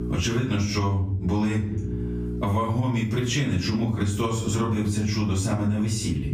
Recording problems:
off-mic speech; far
room echo; noticeable; dies away in 0.5 s
squashed, flat; somewhat
electrical hum; noticeable; throughout; 60 Hz, 15 dB below the speech

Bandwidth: 15.5 kHz